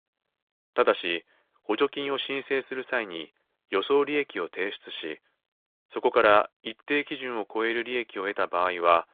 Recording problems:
phone-call audio; nothing above 3.5 kHz

